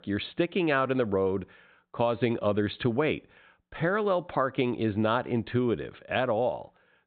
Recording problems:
high frequencies cut off; severe; nothing above 4 kHz

